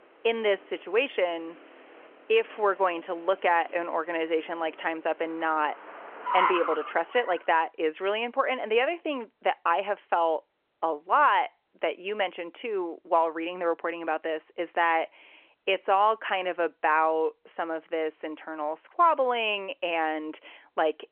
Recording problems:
phone-call audio; nothing above 3 kHz
traffic noise; loud; until 7 s; 7 dB below the speech

